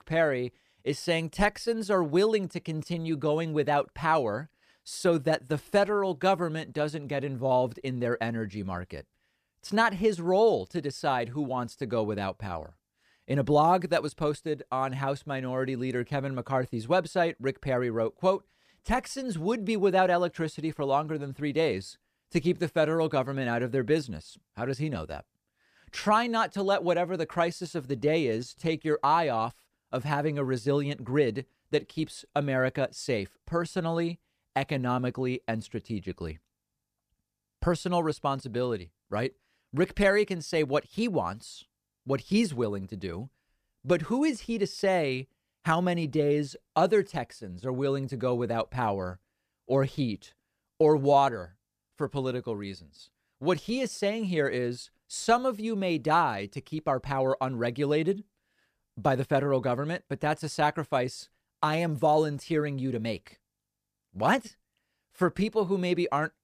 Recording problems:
none

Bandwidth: 14.5 kHz